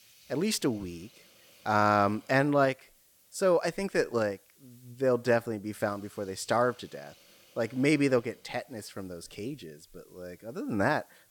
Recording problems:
hiss; faint; throughout; 30 dB below the speech

